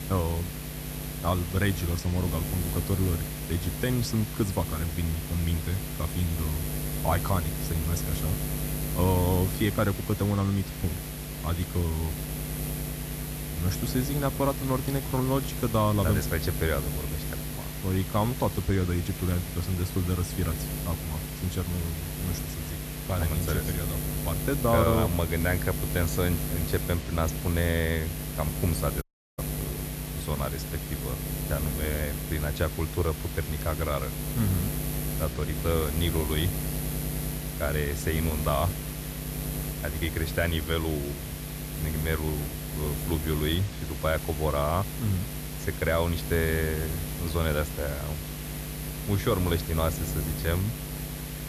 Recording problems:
electrical hum; loud; throughout; 60 Hz, 8 dB below the speech
hiss; noticeable; throughout; 15 dB below the speech
audio cutting out; at 29 s

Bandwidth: 14.5 kHz